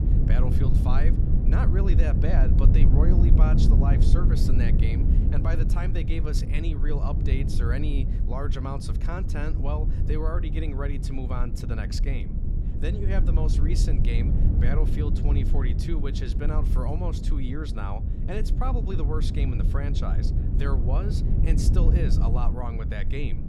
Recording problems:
low rumble; loud; throughout; 2 dB below the speech

